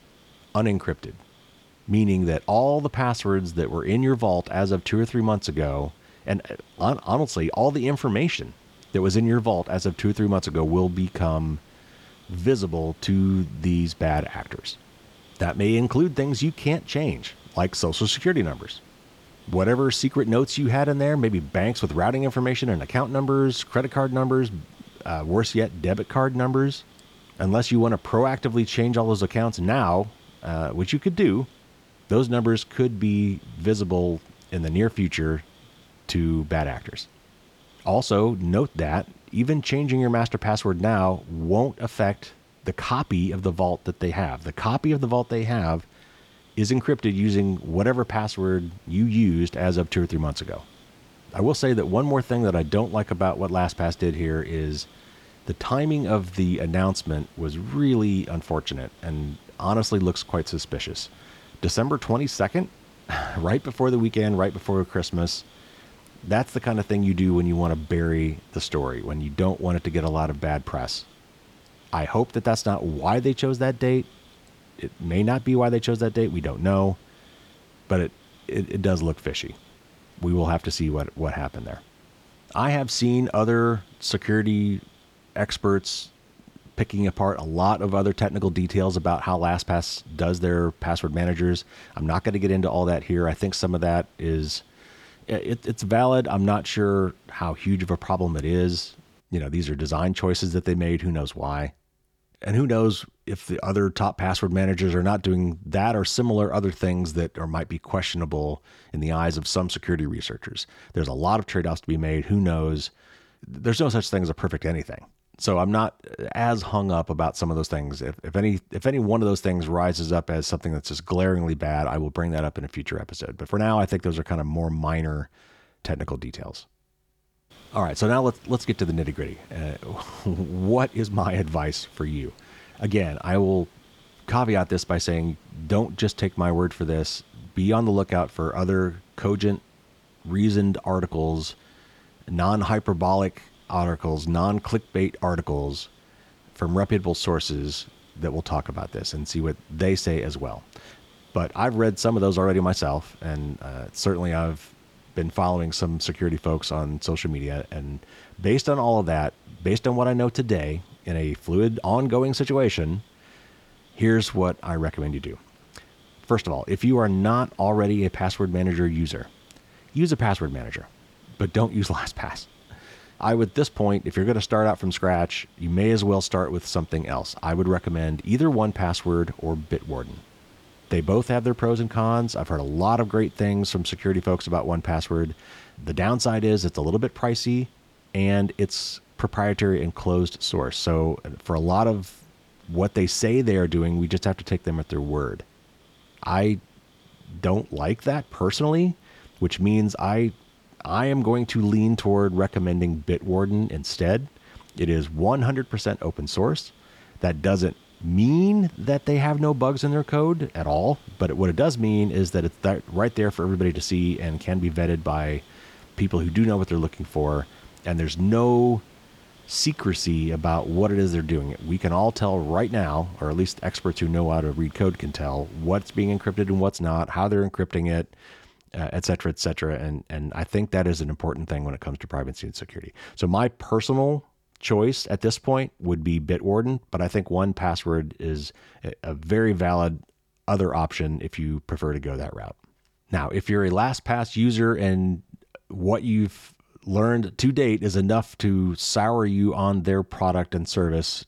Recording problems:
hiss; faint; until 1:39 and from 2:08 to 3:47; 30 dB below the speech

